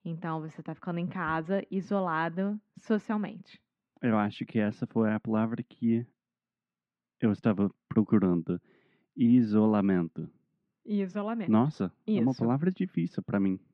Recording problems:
muffled; very; fading above 2 kHz

